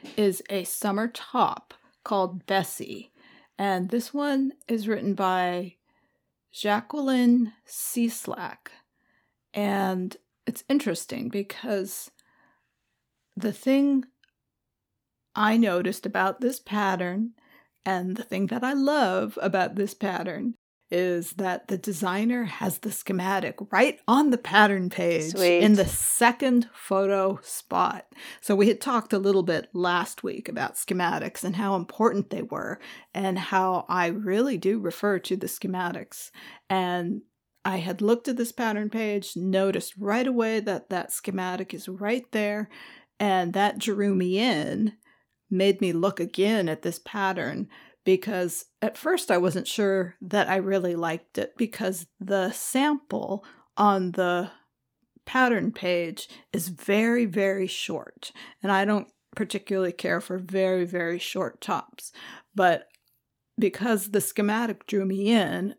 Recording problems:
none

